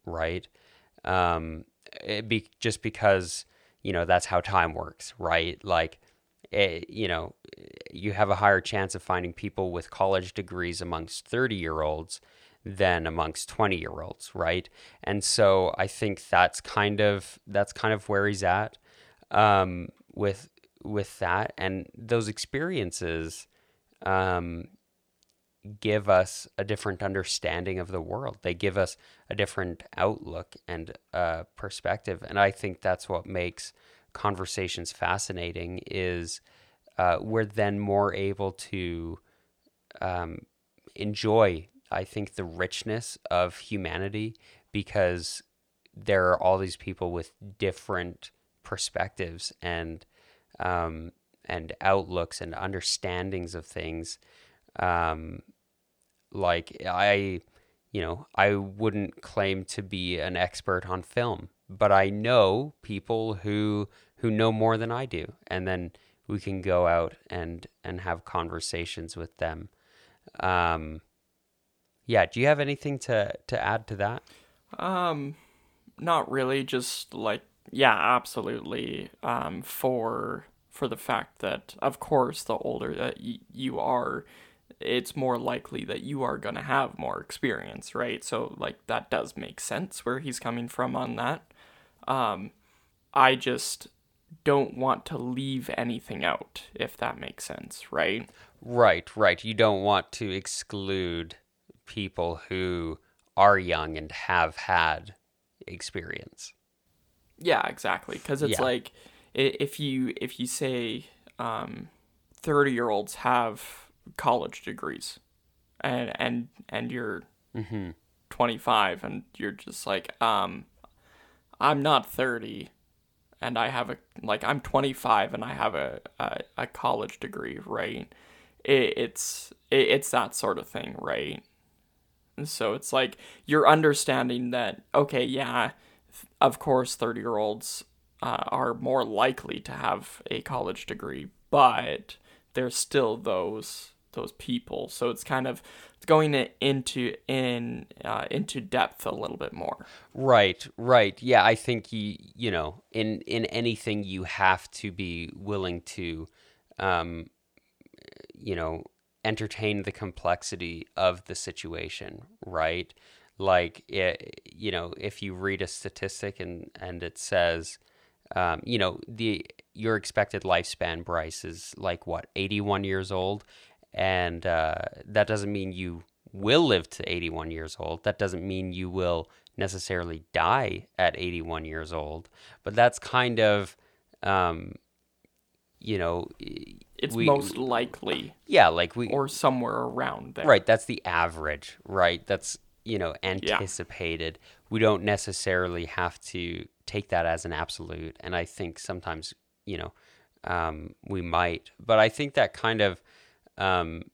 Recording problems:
none

